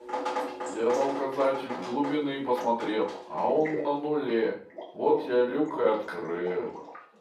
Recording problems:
off-mic speech; far
room echo; slight; dies away in 0.4 s
thin; very slightly; fading below 350 Hz
rain or running water; loud; throughout; 9 dB below the speech
uneven, jittery; strongly; from 0.5 to 6.5 s

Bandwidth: 14.5 kHz